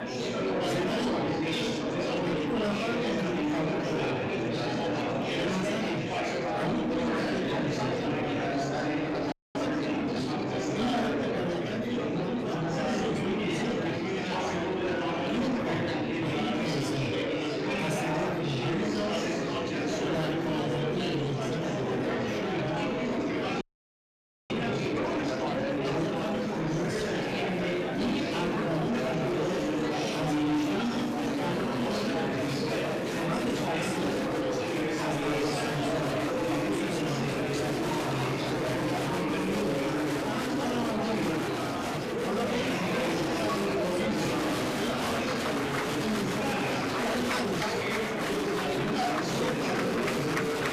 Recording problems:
off-mic speech; far
room echo; slight; dies away in 0.3 s
distortion; slight; 10 dB below the speech
murmuring crowd; very loud; throughout; 4 dB above the speech
audio freezing; at 9.5 s and at 24 s for 1 s

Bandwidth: 14.5 kHz